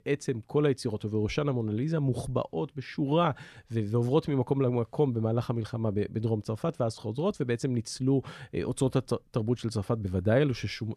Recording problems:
none

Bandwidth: 14 kHz